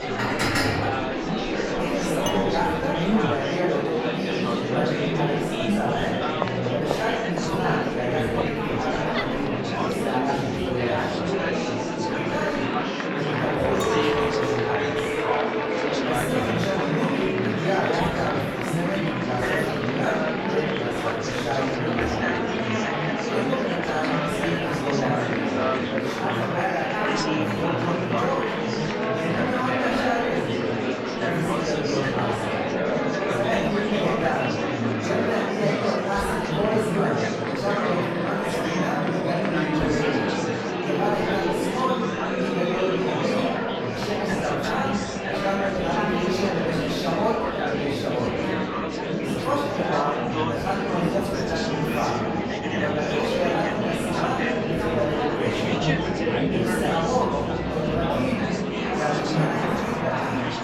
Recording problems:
room echo; strong; dies away in 1.1 s
off-mic speech; far
murmuring crowd; very loud; throughout; 3 dB above the speech
background music; noticeable; throughout; 15 dB below the speech
clattering dishes; loud; at the start and from 14 to 17 s; peak 5 dB above the speech
clattering dishes; noticeable; at 2.5 s; peak 6 dB below the speech

